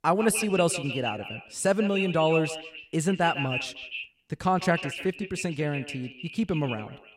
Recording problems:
echo of what is said; strong; throughout; 150 ms later, 7 dB below the speech

